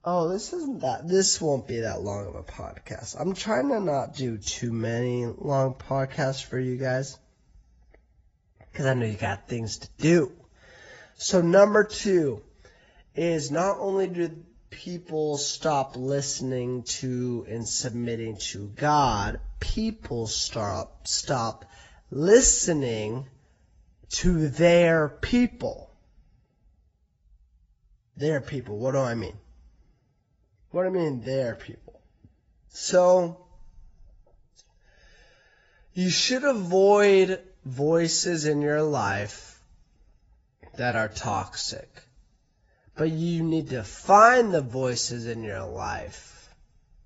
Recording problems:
garbled, watery; badly; nothing above 7.5 kHz
wrong speed, natural pitch; too slow; 0.6 times normal speed

